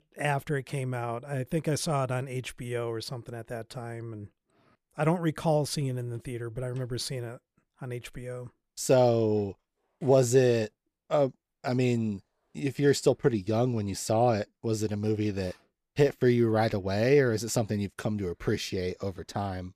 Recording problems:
none

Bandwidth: 14.5 kHz